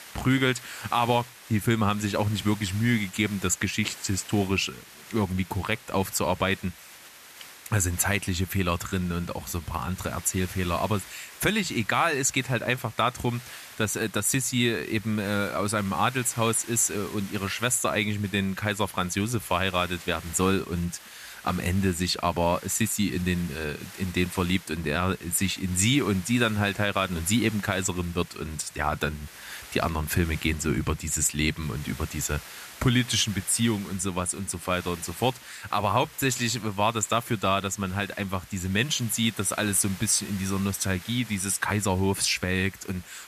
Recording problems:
hiss; noticeable; throughout; 15 dB below the speech

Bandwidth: 14.5 kHz